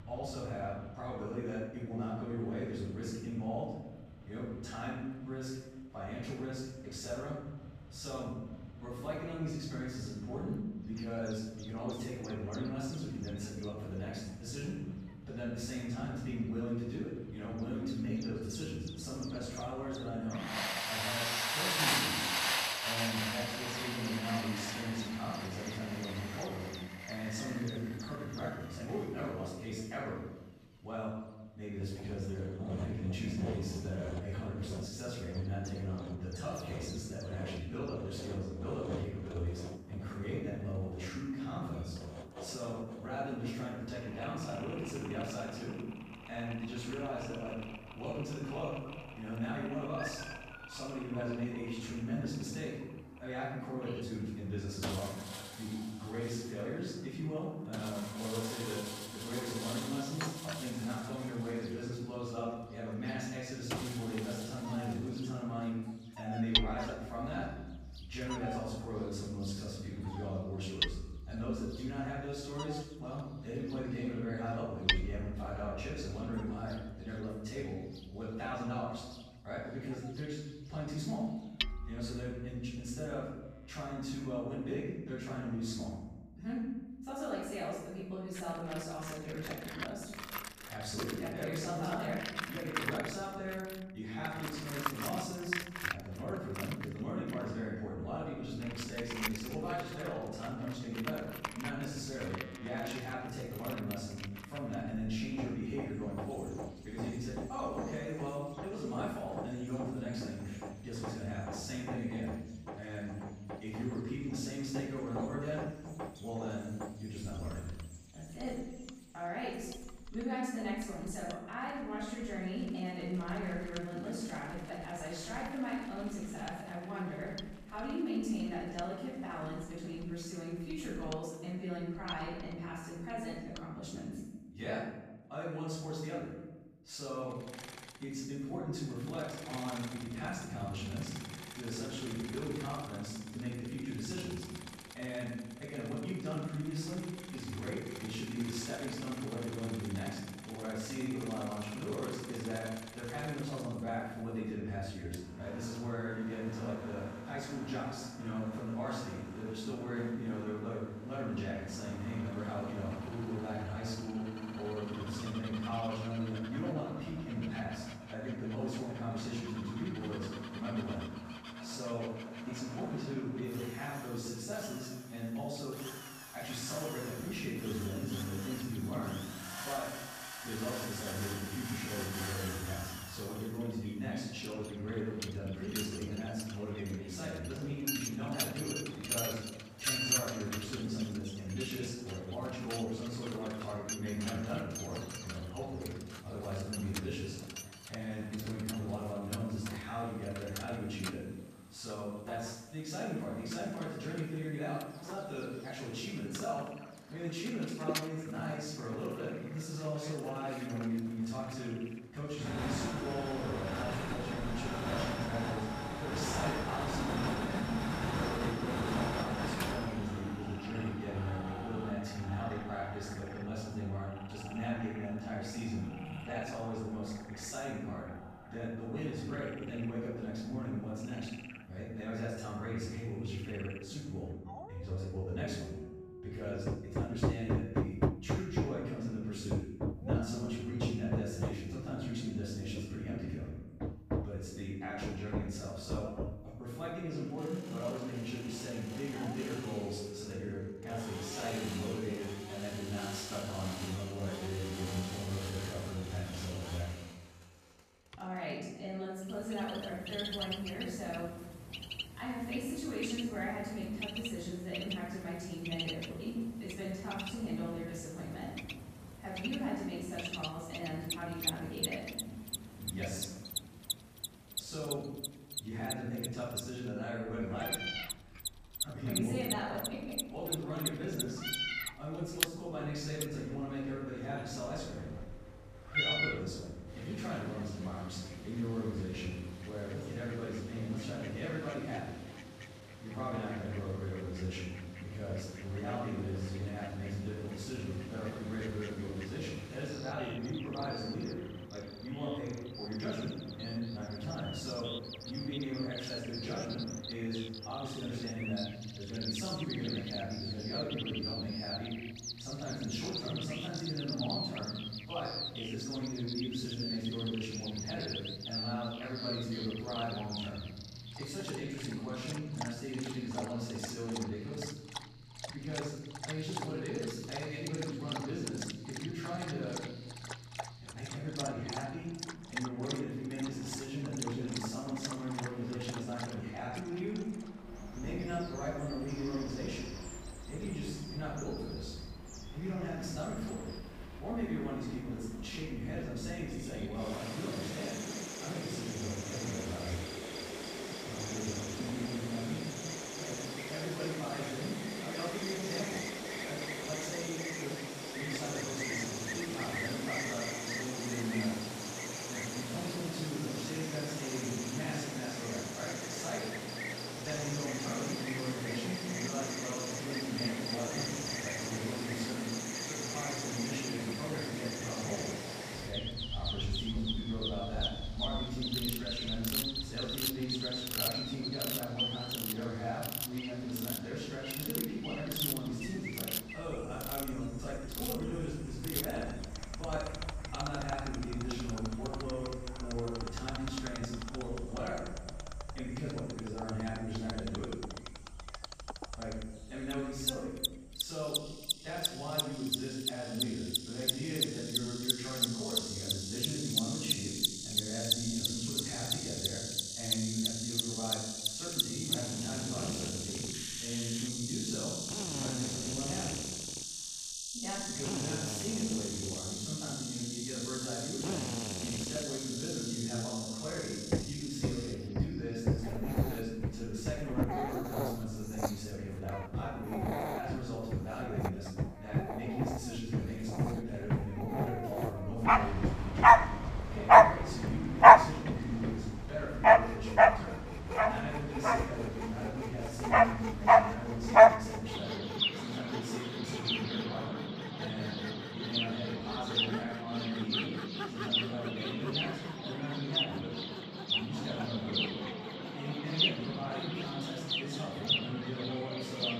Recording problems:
room echo; strong; dies away in 1 s
off-mic speech; far
animal sounds; very loud; throughout; 5 dB above the speech
machinery noise; loud; throughout; 3 dB below the speech
abrupt cut into speech; at the end

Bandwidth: 14.5 kHz